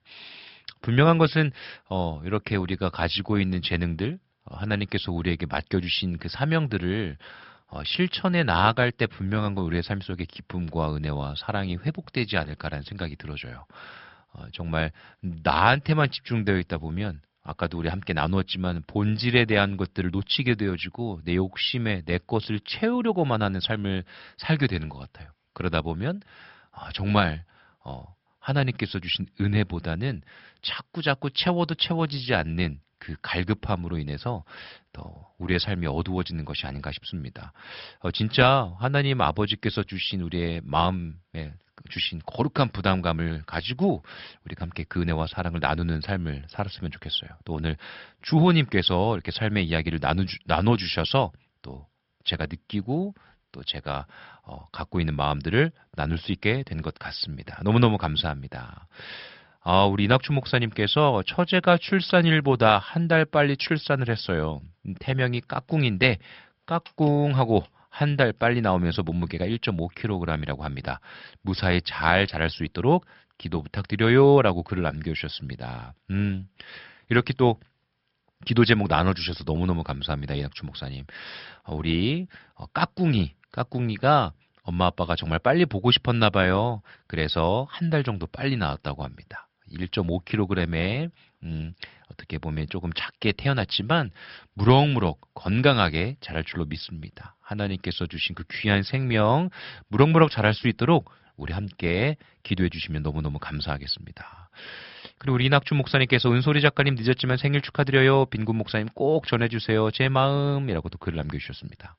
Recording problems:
high frequencies cut off; noticeable; nothing above 5.5 kHz

